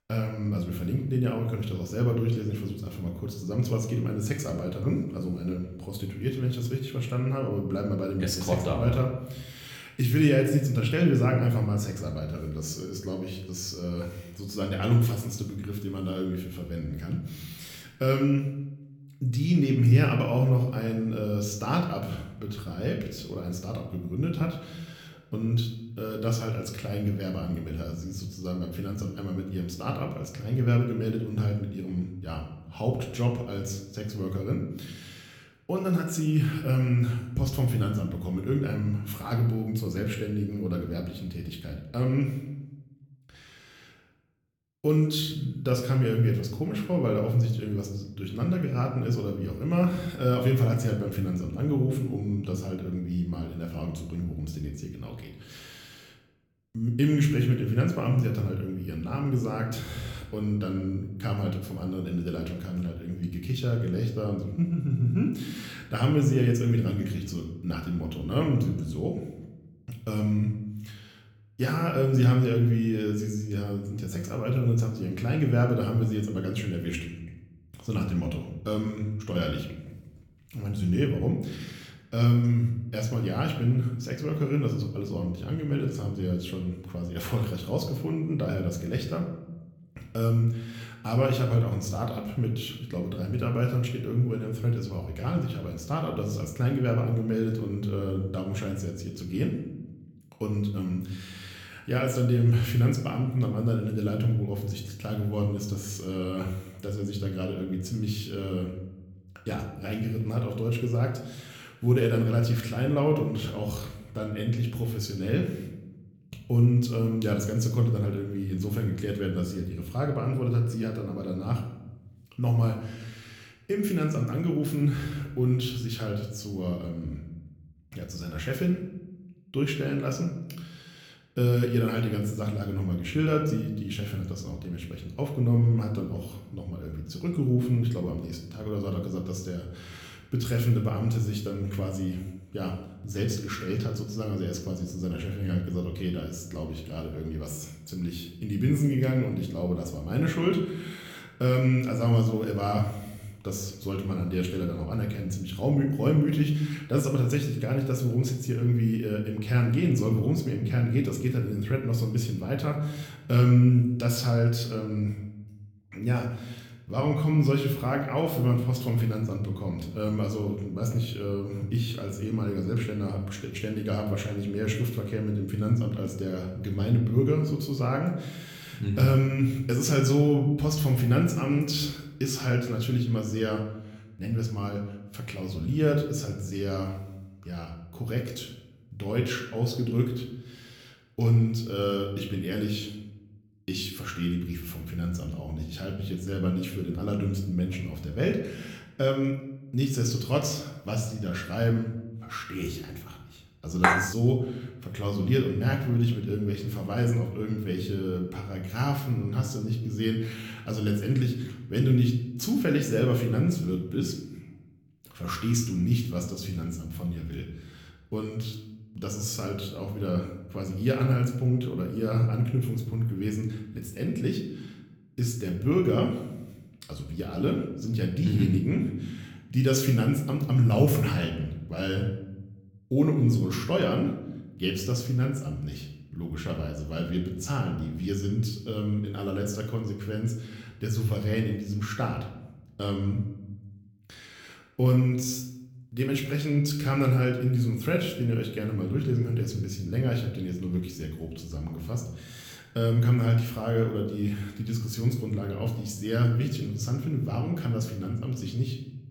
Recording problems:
room echo; slight; dies away in 0.7 s
off-mic speech; somewhat distant
clattering dishes; loud; at 3:24; peak 5 dB above the speech

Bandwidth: 18 kHz